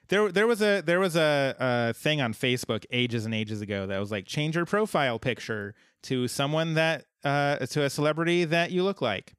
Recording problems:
none

